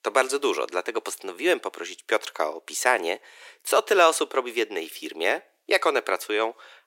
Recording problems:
thin; very; fading below 350 Hz

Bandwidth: 16 kHz